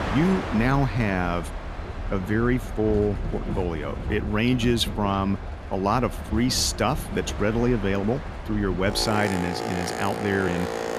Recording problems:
train or aircraft noise; loud; throughout; 7 dB below the speech

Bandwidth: 14.5 kHz